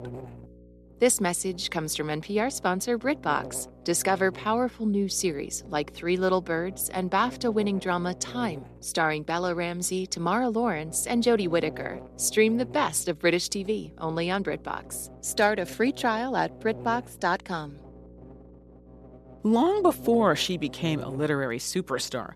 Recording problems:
electrical hum; faint; throughout; 60 Hz, 20 dB below the speech

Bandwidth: 13.5 kHz